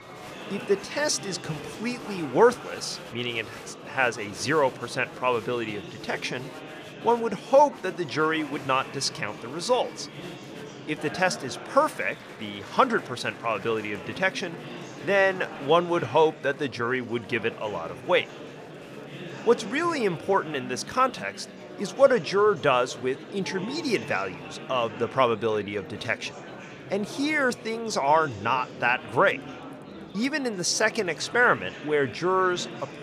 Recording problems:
murmuring crowd; noticeable; throughout; 15 dB below the speech

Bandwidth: 14.5 kHz